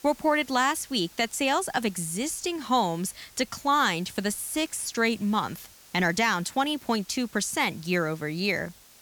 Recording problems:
hiss; faint; throughout; 25 dB below the speech

